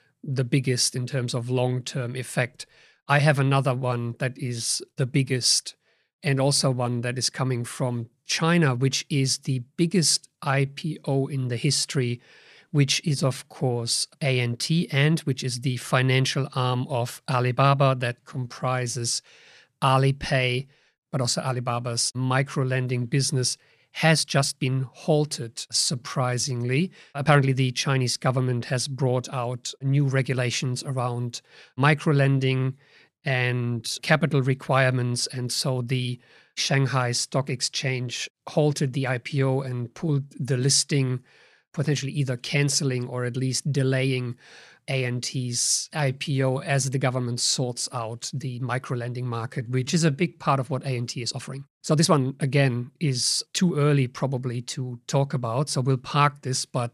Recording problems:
uneven, jittery; strongly; from 6 to 54 s

